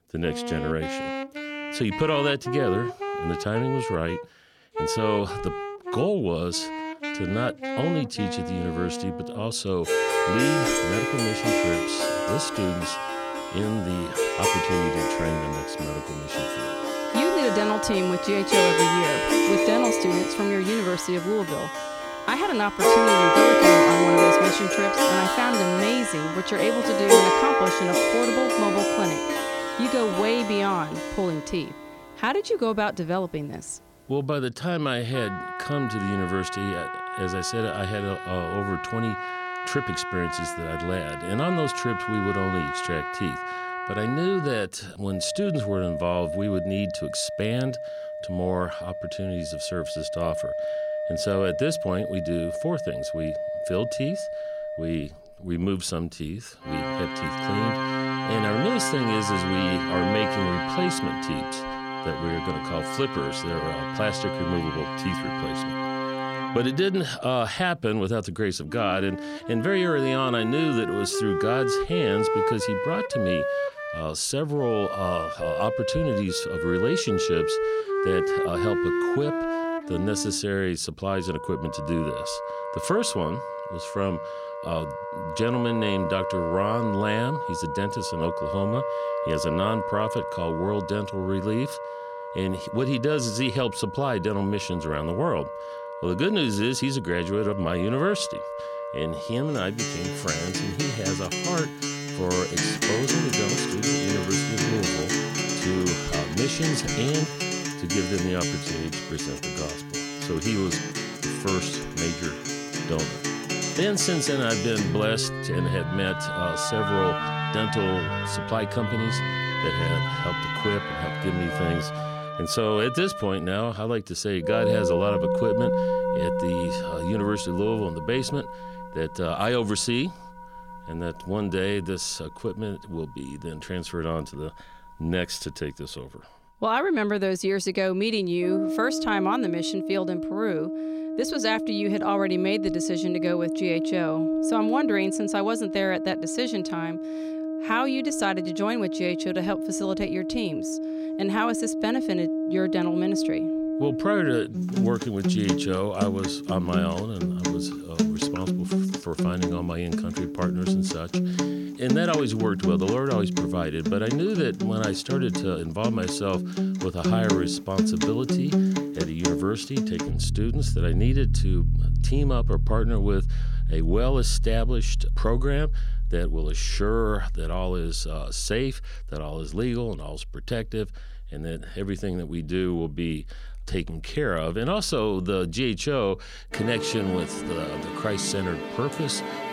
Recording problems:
background music; very loud; throughout; as loud as the speech

